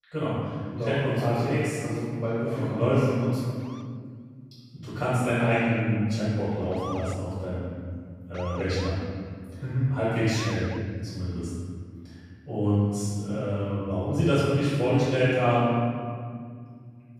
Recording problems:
room echo; strong; dies away in 2.2 s
off-mic speech; far
siren; faint; from 3.5 to 11 s; peak 10 dB below the speech

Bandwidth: 14.5 kHz